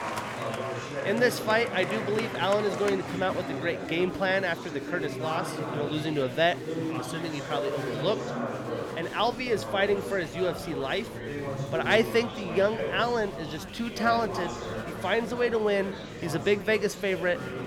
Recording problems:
chatter from many people; loud; throughout; 6 dB below the speech

